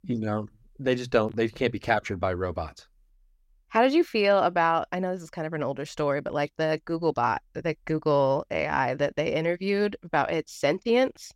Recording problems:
none

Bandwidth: 16 kHz